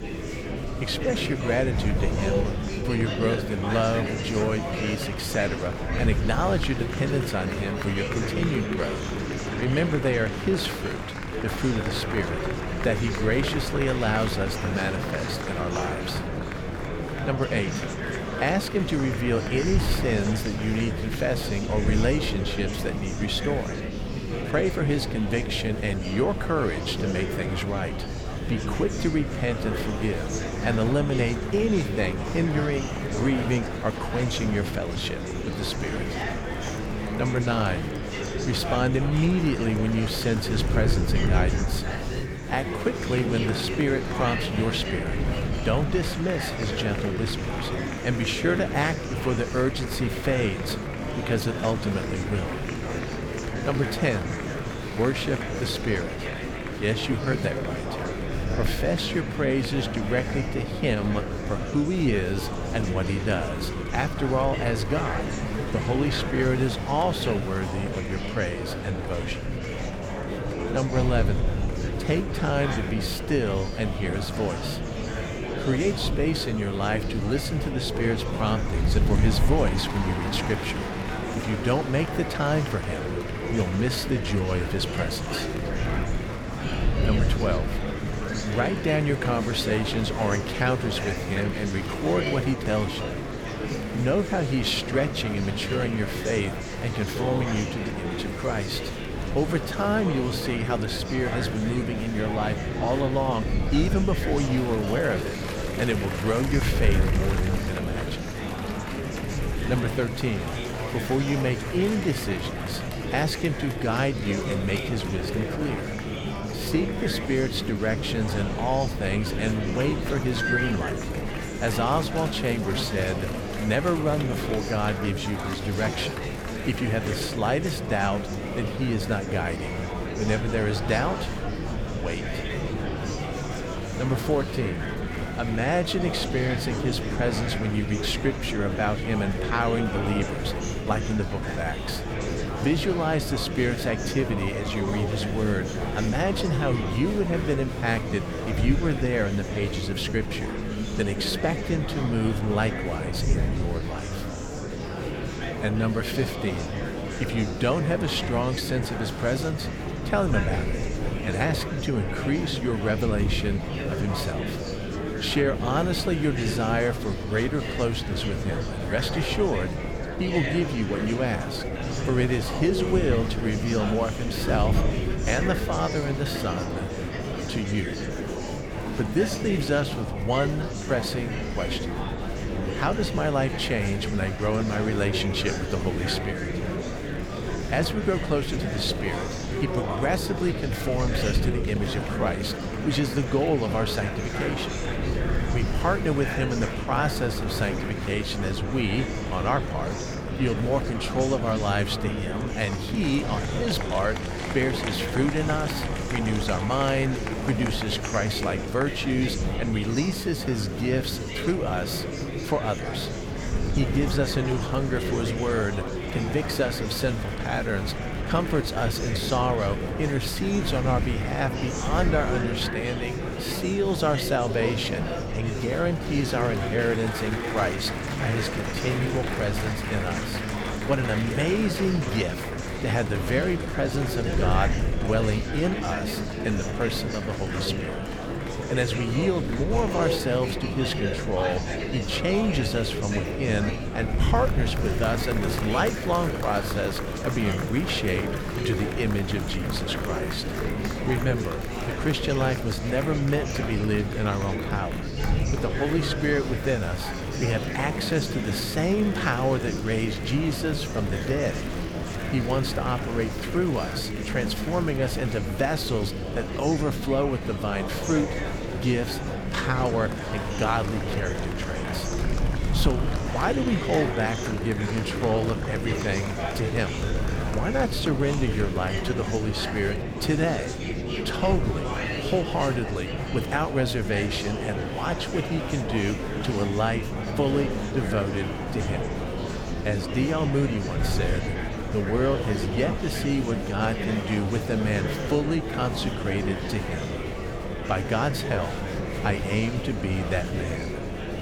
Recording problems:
murmuring crowd; loud; throughout; 3 dB below the speech
wind noise on the microphone; occasional gusts; 20 dB below the speech
rain or running water; very faint; throughout; 30 dB below the speech

